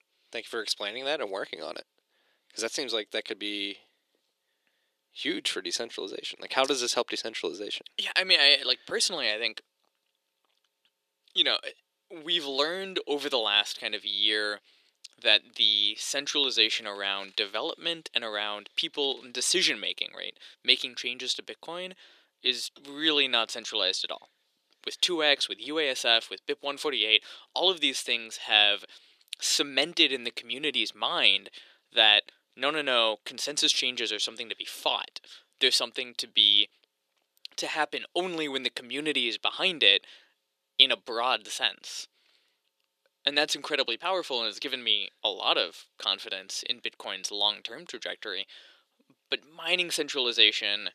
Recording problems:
thin; somewhat; fading below 350 Hz

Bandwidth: 14.5 kHz